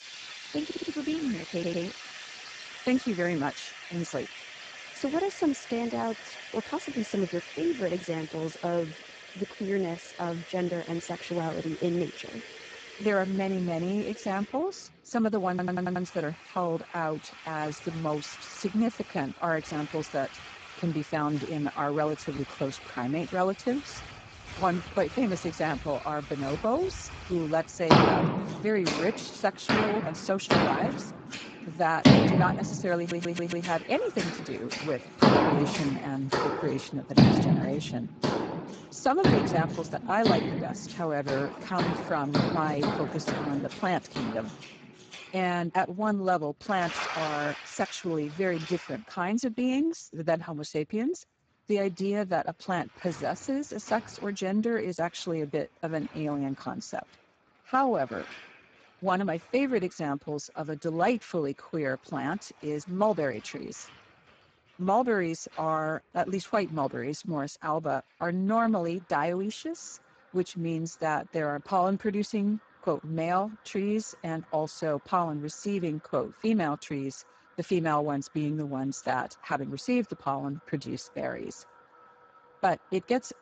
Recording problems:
garbled, watery; badly; nothing above 7.5 kHz
household noises; loud; throughout; 1 dB below the speech
audio stuttering; 4 times, first at 0.5 s

